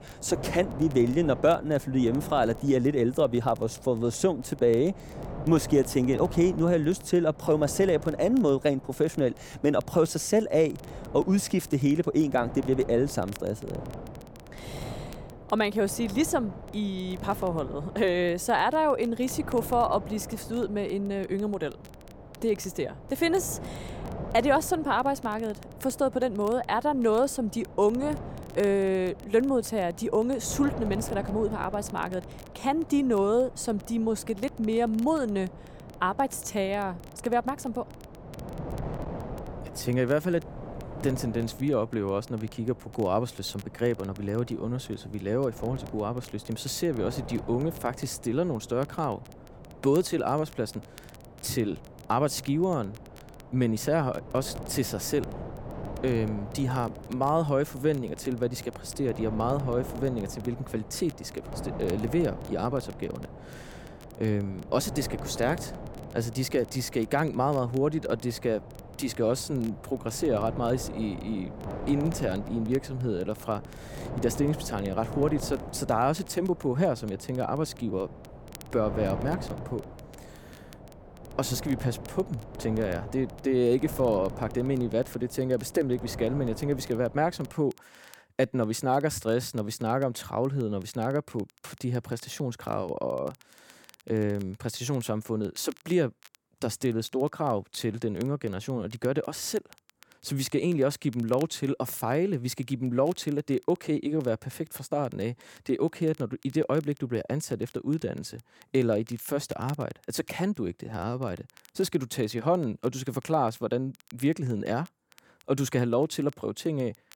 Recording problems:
wind noise on the microphone; occasional gusts; until 1:28; 15 dB below the speech
crackle, like an old record; faint; 30 dB below the speech

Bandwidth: 17 kHz